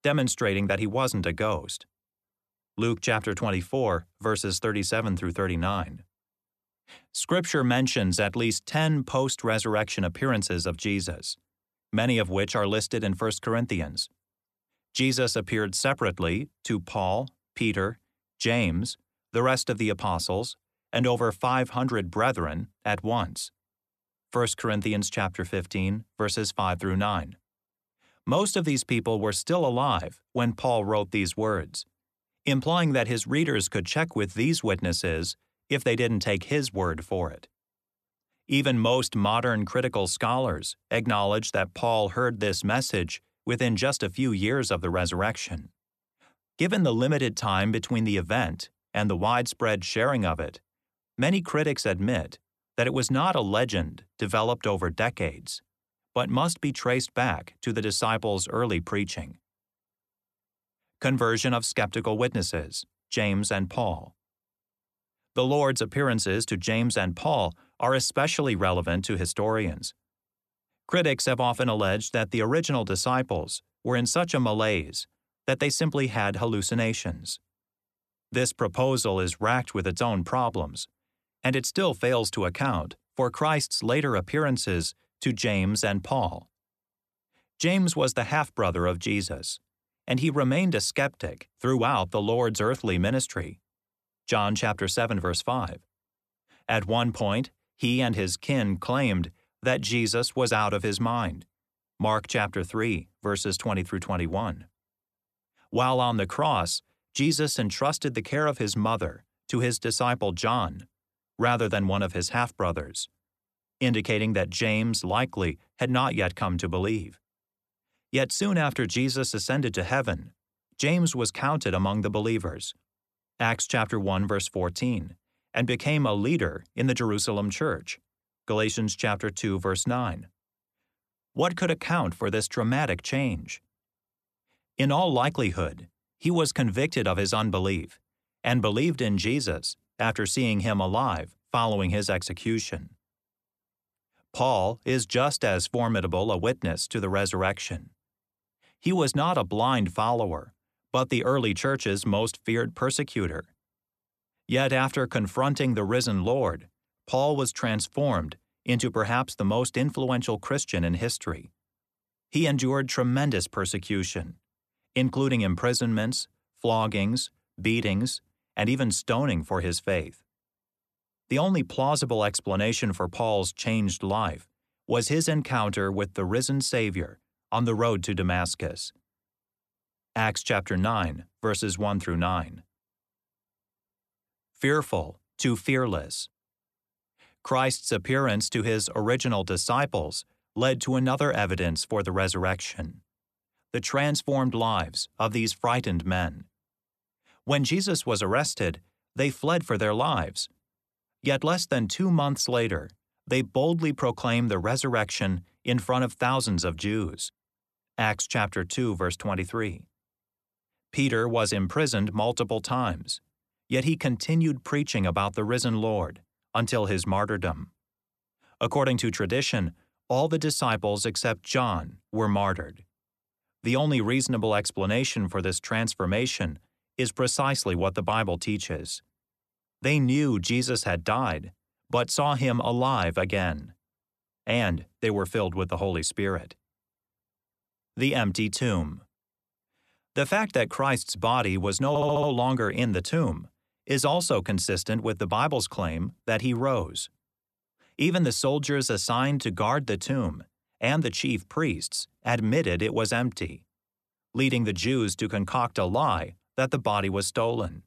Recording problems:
audio stuttering; at 4:02

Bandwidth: 13.5 kHz